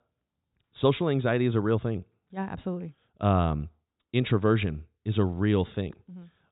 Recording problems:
high frequencies cut off; severe; nothing above 4 kHz

